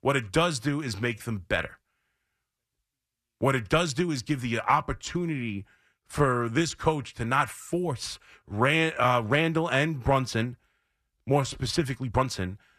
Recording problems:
uneven, jittery; strongly; from 1 to 12 s

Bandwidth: 14 kHz